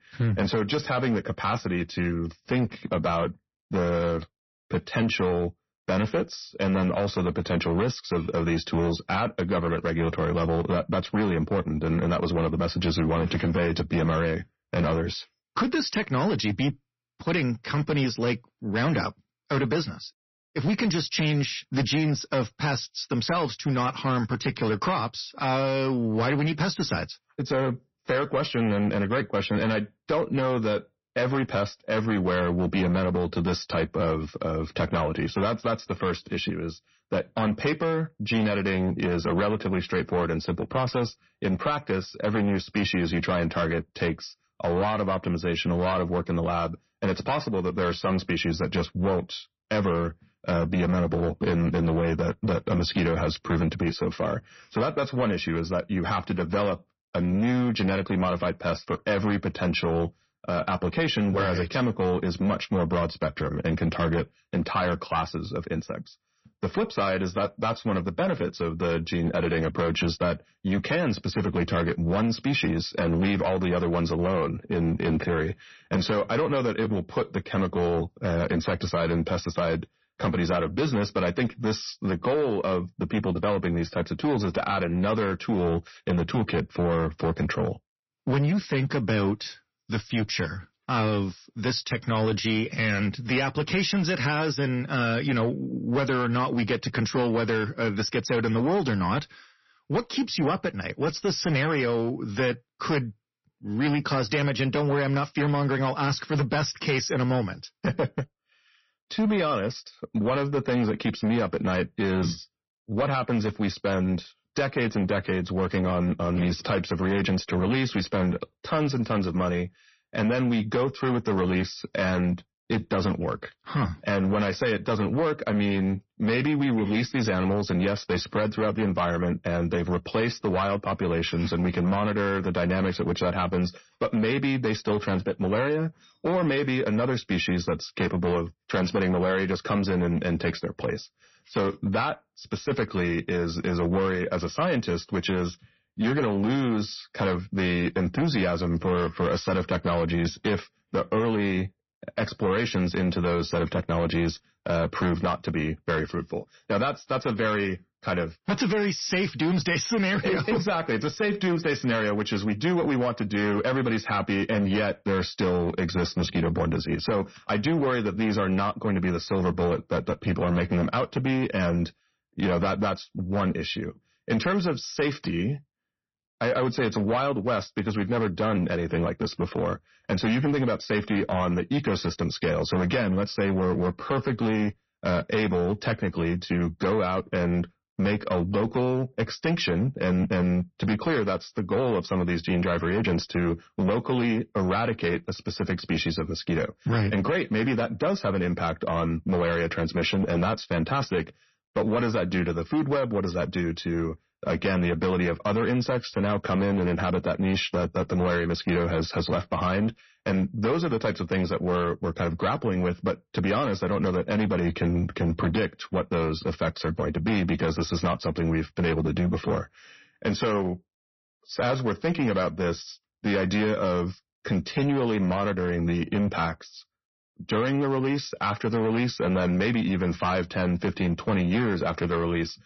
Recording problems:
distortion; slight; 11% of the sound clipped
garbled, watery; slightly; nothing above 6 kHz

